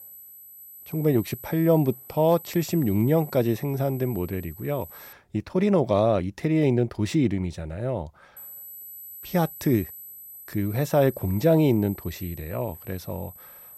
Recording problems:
high-pitched whine; noticeable; until 5 s and from 8.5 s on; 12 kHz, 15 dB below the speech

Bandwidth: 16 kHz